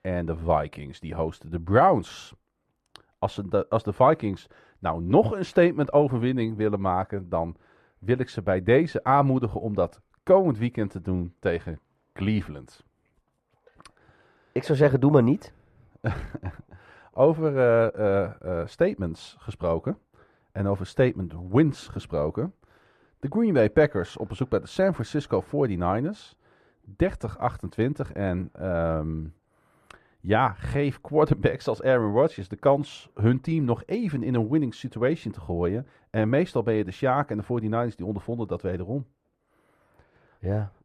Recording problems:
muffled; very; fading above 2.5 kHz

